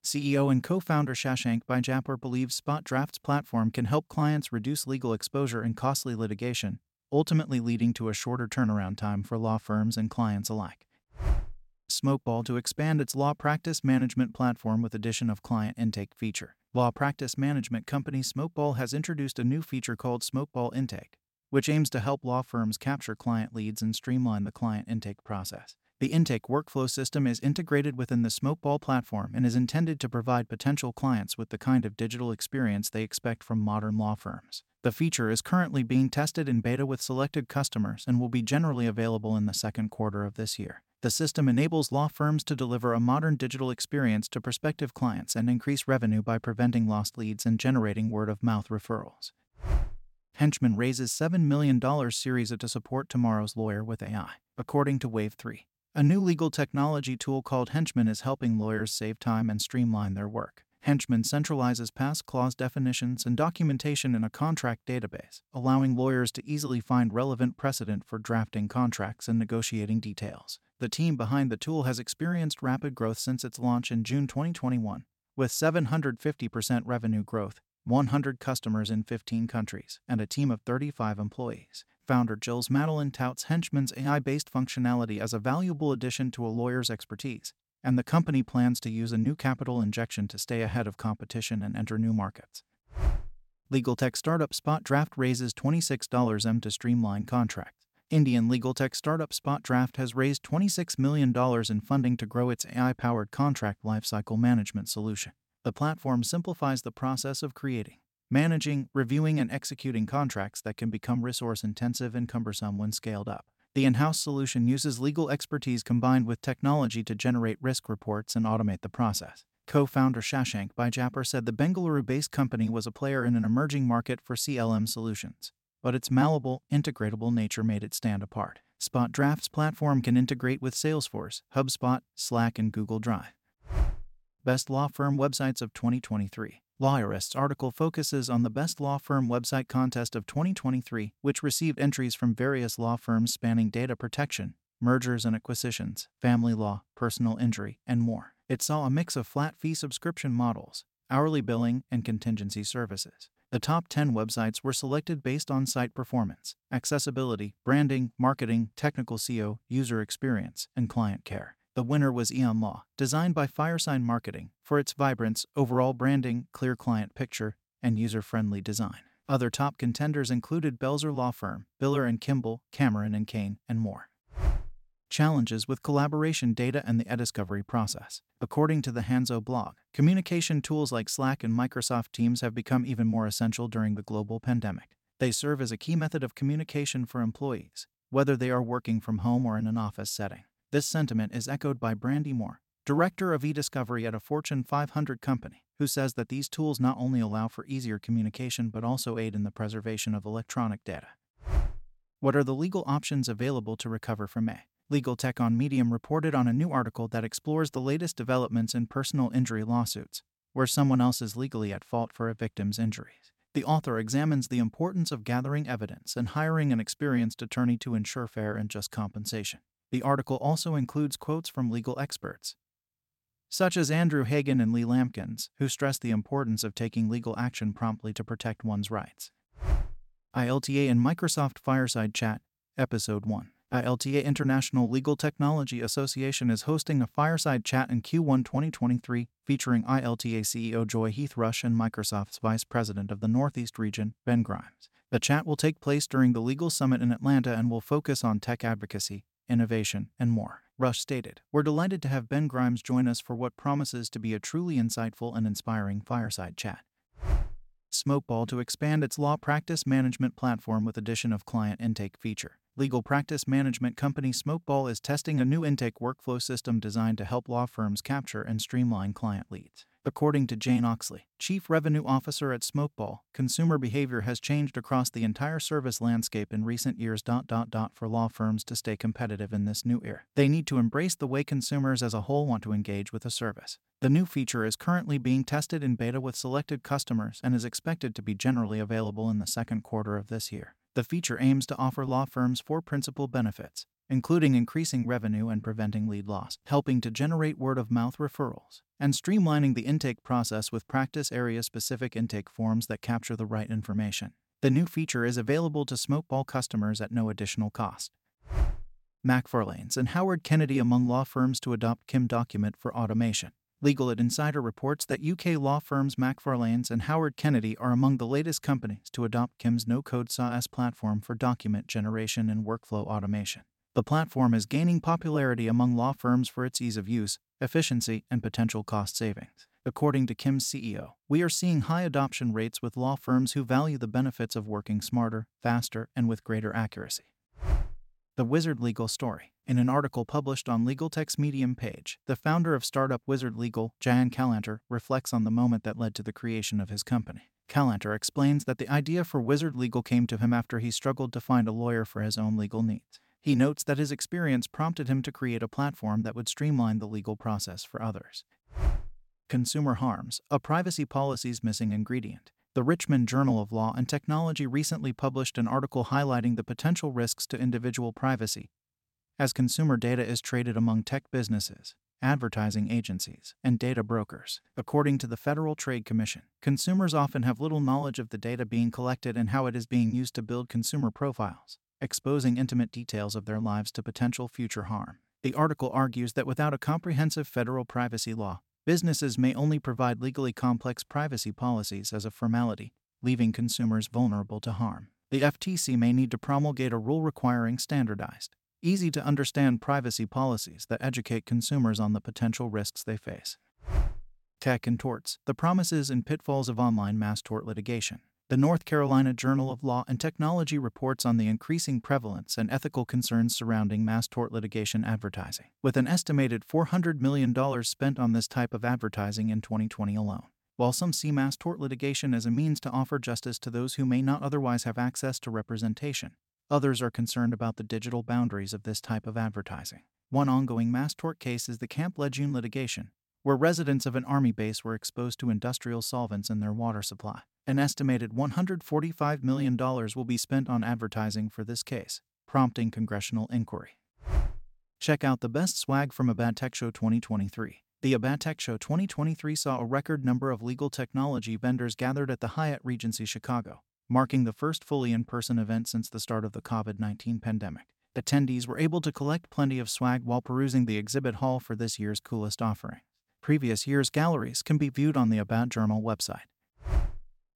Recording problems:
none

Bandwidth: 16.5 kHz